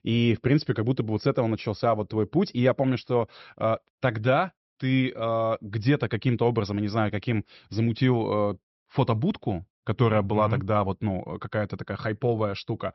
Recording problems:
high frequencies cut off; noticeable; nothing above 5.5 kHz

